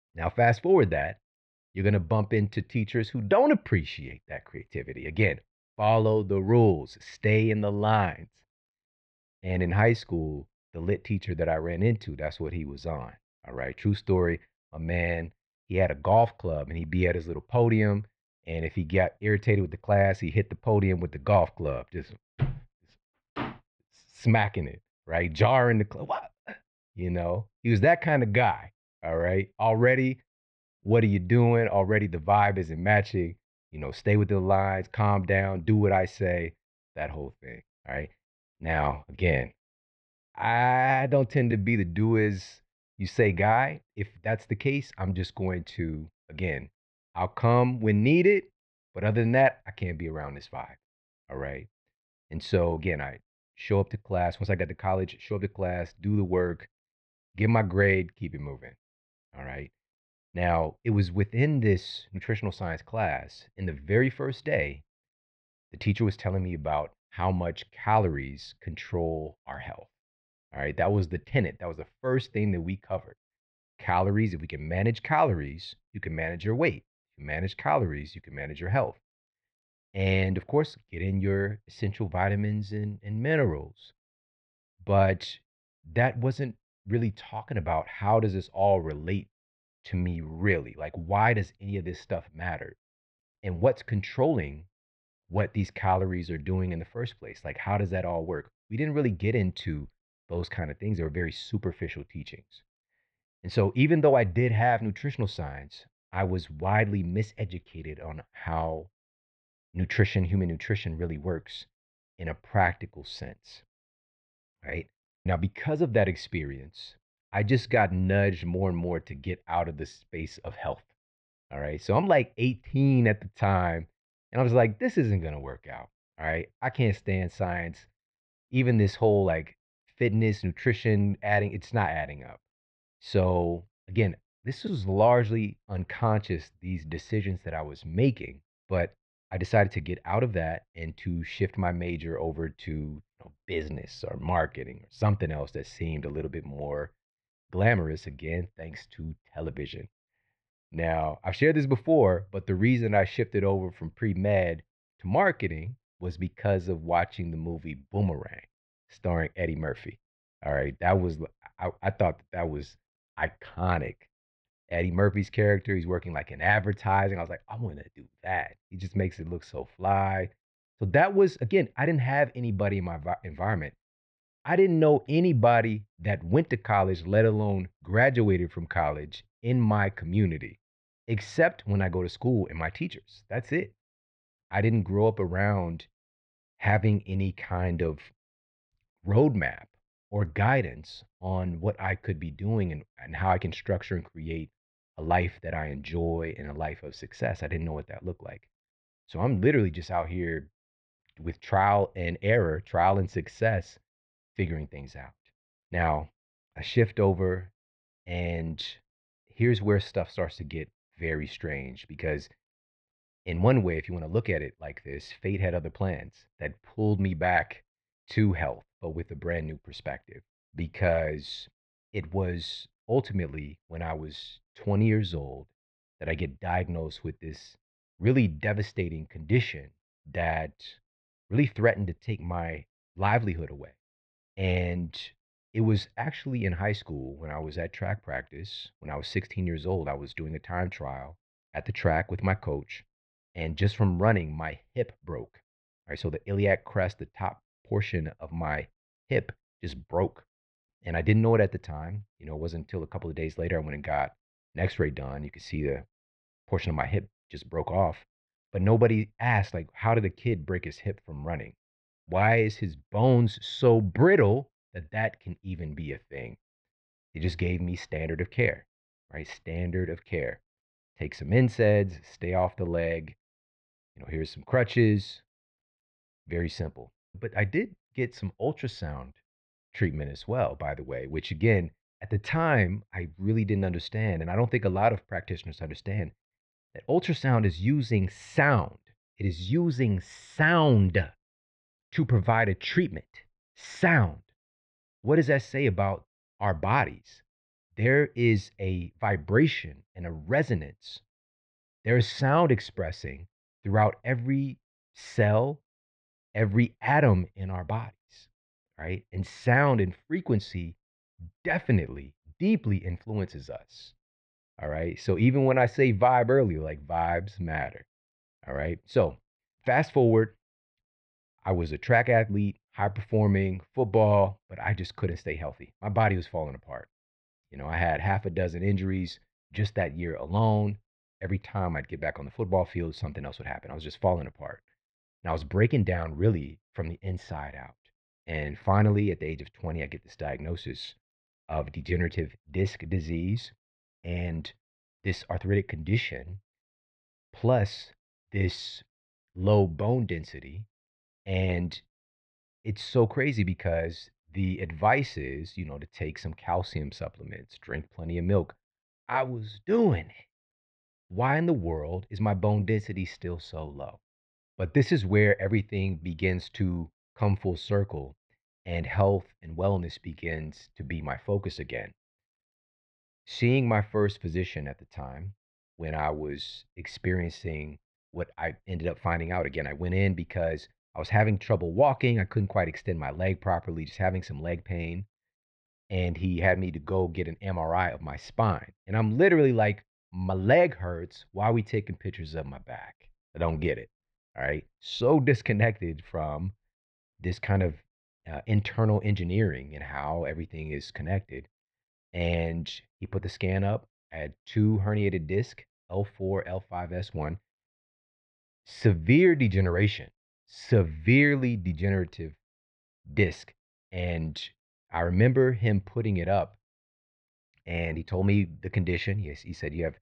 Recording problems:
muffled; very; fading above 3 kHz

